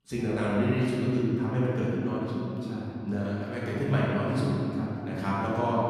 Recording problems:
room echo; strong; dies away in 3 s
off-mic speech; far

